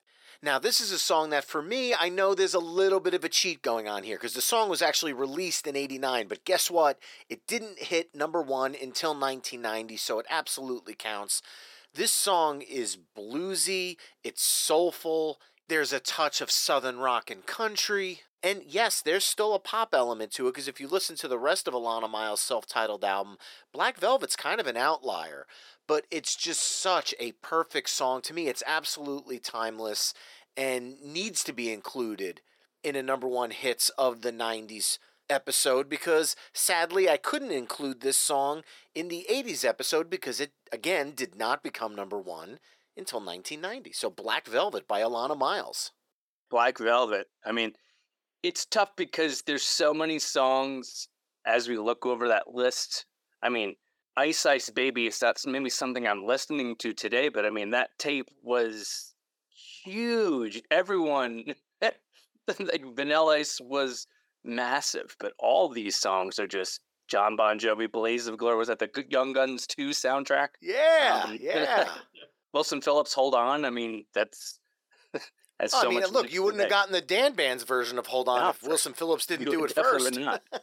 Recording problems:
thin; somewhat; fading below 400 Hz

